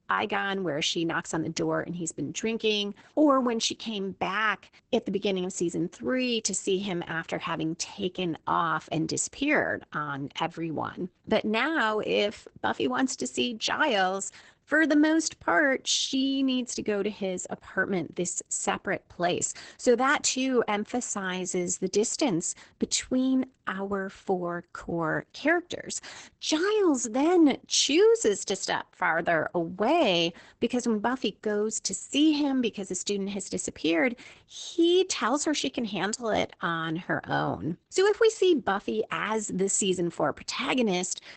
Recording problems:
garbled, watery; badly; nothing above 8 kHz

